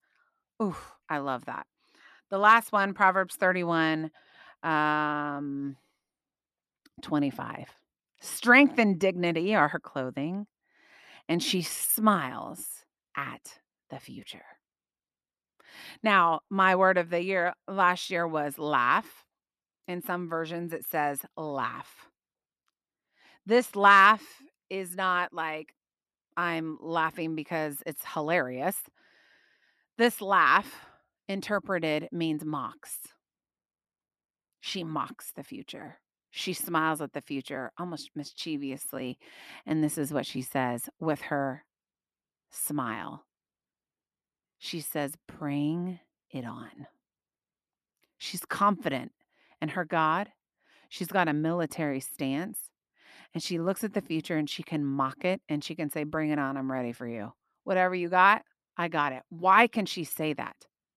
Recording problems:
none

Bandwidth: 13.5 kHz